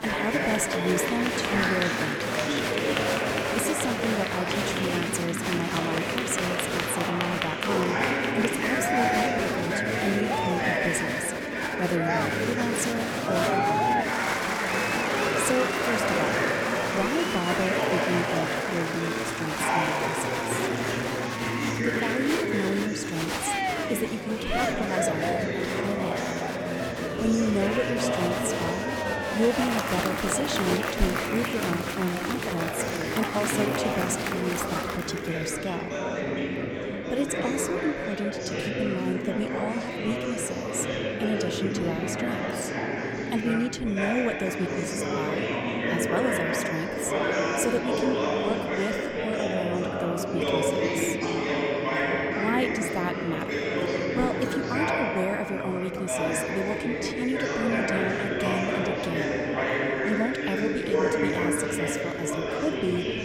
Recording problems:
murmuring crowd; very loud; throughout; 4 dB above the speech

